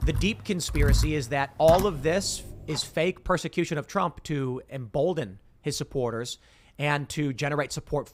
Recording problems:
household noises; loud; until 2.5 s; 3 dB below the speech

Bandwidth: 15.5 kHz